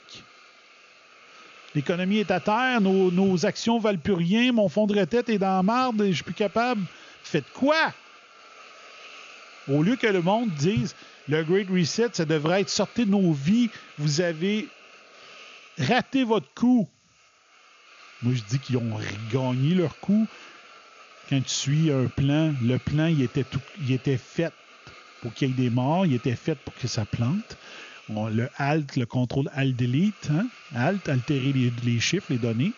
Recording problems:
high frequencies cut off; noticeable; nothing above 7 kHz
hiss; faint; throughout; 20 dB below the speech

